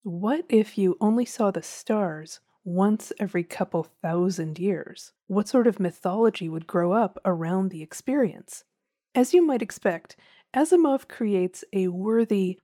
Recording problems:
none

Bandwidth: 19 kHz